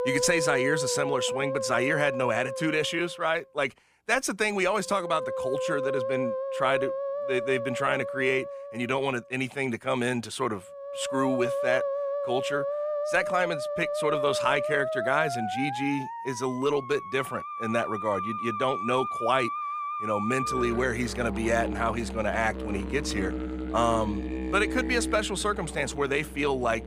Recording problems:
background music; loud; throughout; 4 dB below the speech

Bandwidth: 15 kHz